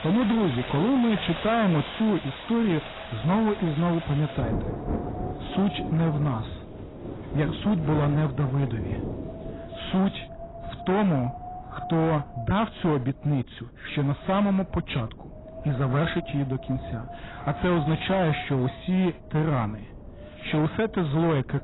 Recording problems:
garbled, watery; badly; nothing above 4 kHz
distortion; slight; 13% of the sound clipped
rain or running water; loud; until 9.5 s; 10 dB below the speech
wind noise on the microphone; occasional gusts; 15 dB below the speech

